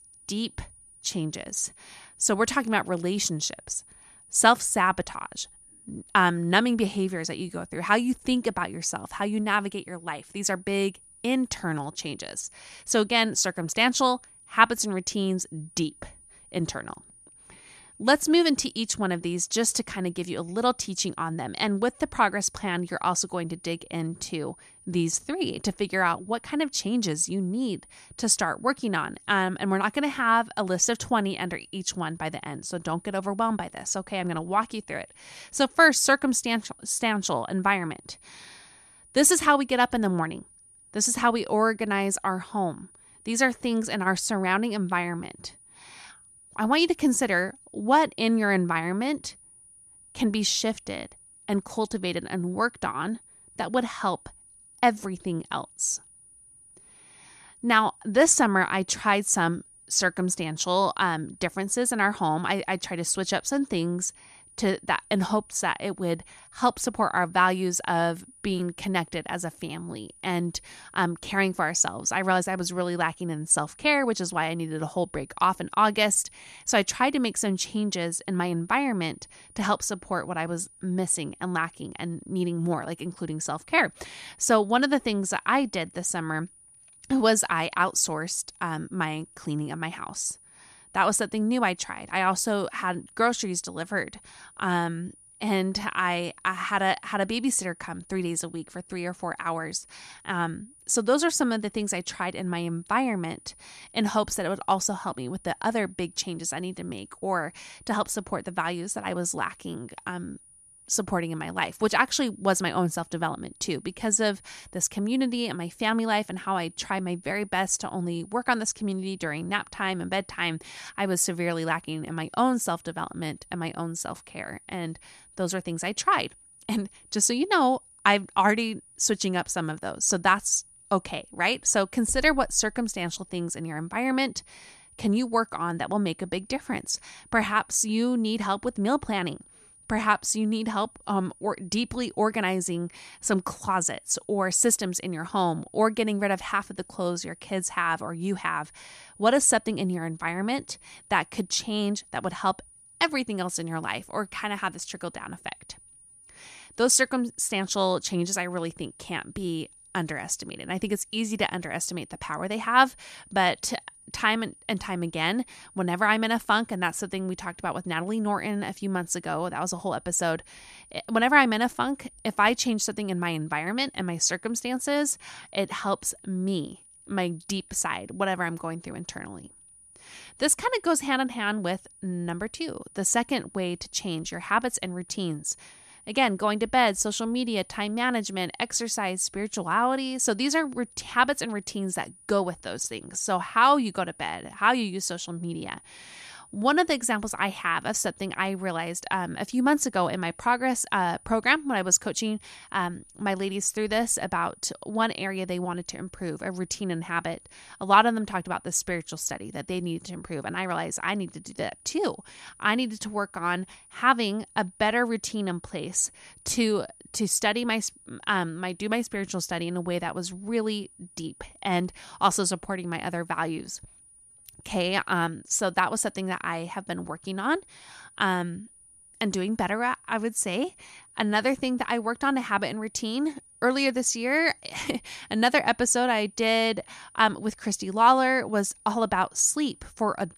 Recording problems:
high-pitched whine; faint; throughout; 9.5 kHz, 25 dB below the speech

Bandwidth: 14.5 kHz